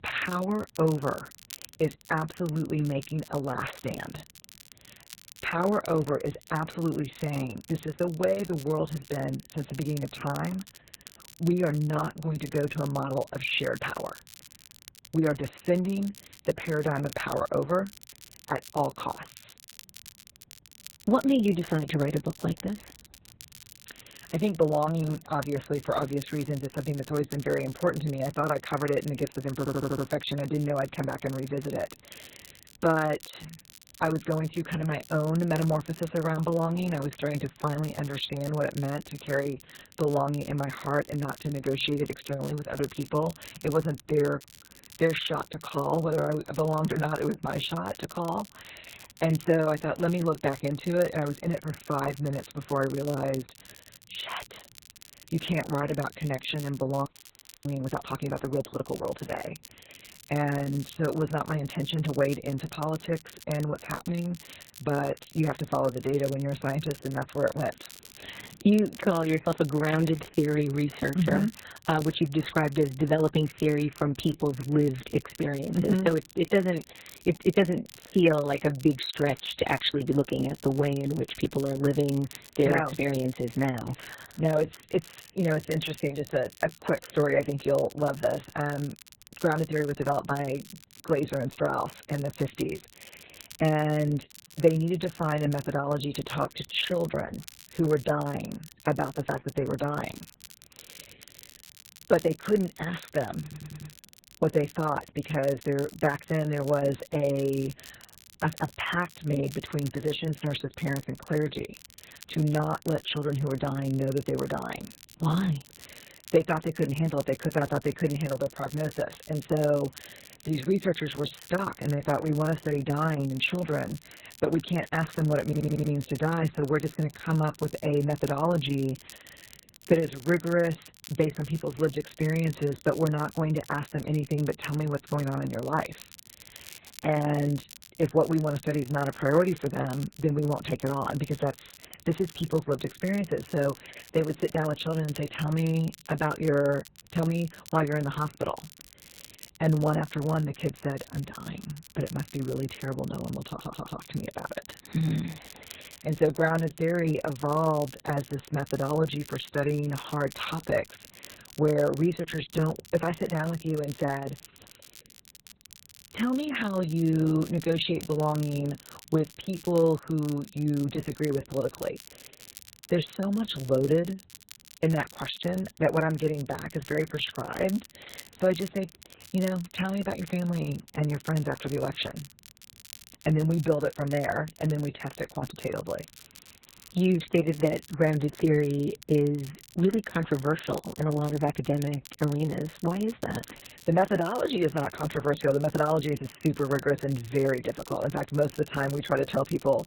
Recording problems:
garbled, watery; badly; nothing above 4 kHz
crackle, like an old record; noticeable; 20 dB below the speech
audio stuttering; 4 times, first at 30 s
audio freezing; at 57 s for 0.5 s

